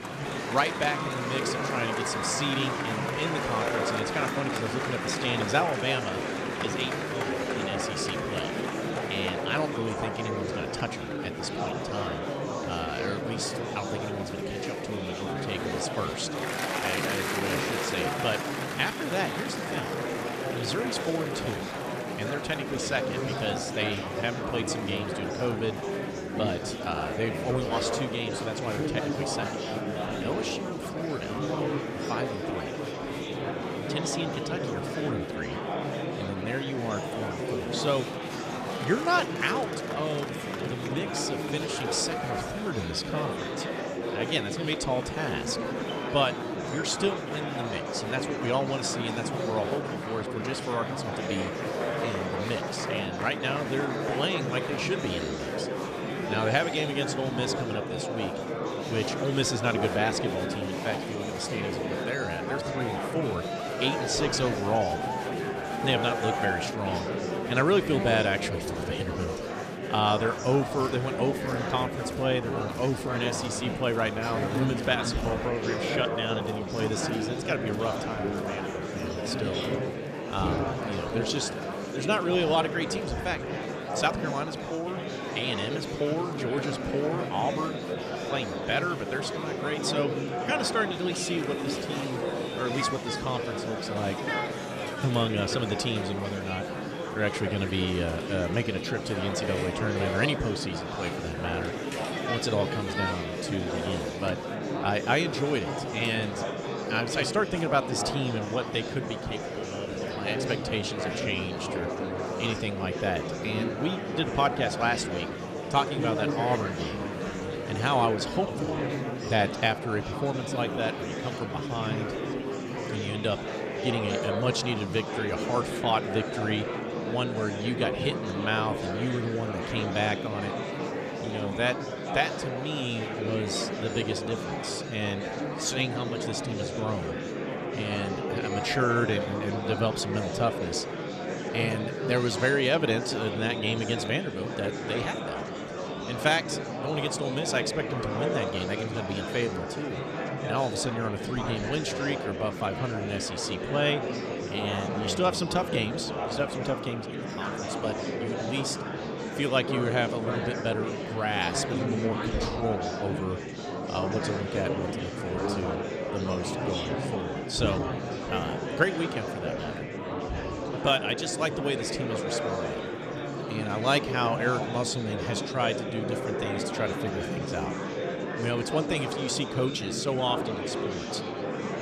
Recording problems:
murmuring crowd; loud; throughout; 1 dB below the speech

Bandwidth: 14.5 kHz